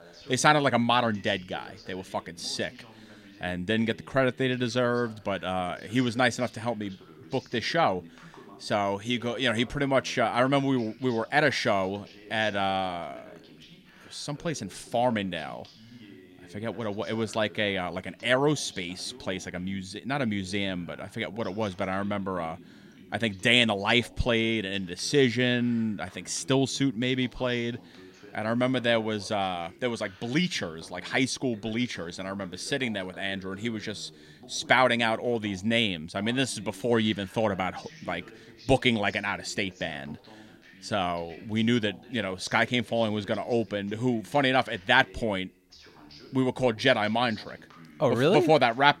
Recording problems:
voice in the background; faint; throughout; 25 dB below the speech

